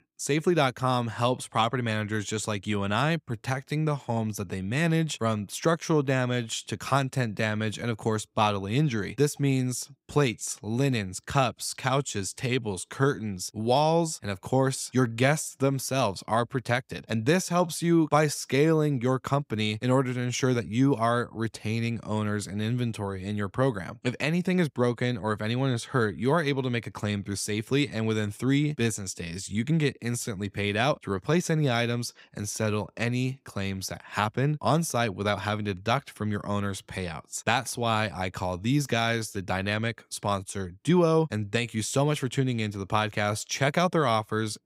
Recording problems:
none

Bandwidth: 15.5 kHz